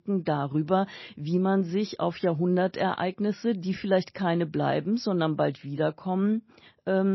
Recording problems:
garbled, watery; slightly; nothing above 5.5 kHz
abrupt cut into speech; at the end

